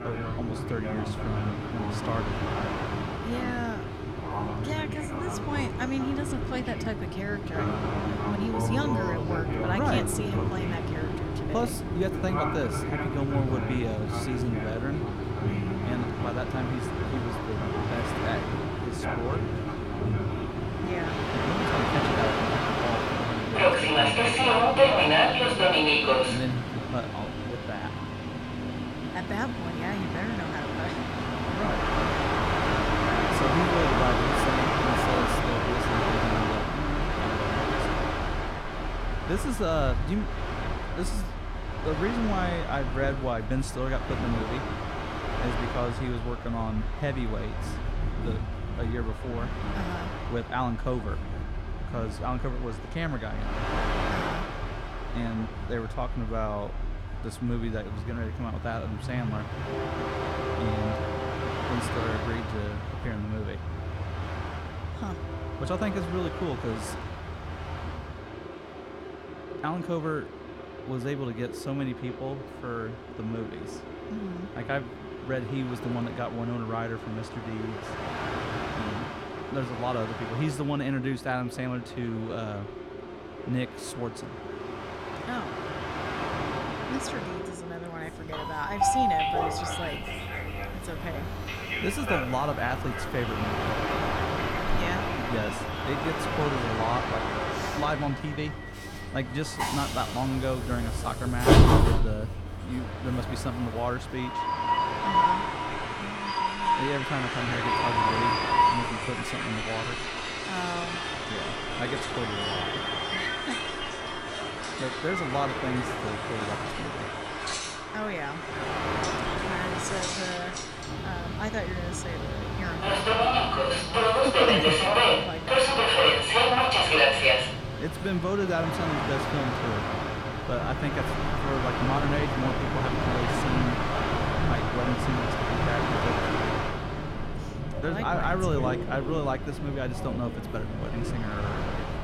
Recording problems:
train or aircraft noise; very loud; throughout; 5 dB above the speech

